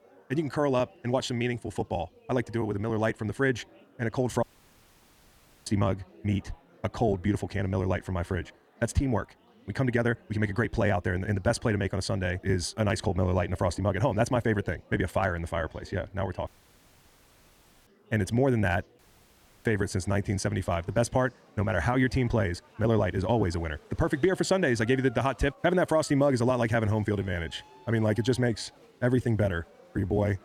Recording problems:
wrong speed, natural pitch; too fast; 1.6 times normal speed
chatter from many people; faint; throughout; 25 dB below the speech
audio cutting out; at 4.5 s for 1 s, at 16 s for 1.5 s and at 19 s for 0.5 s

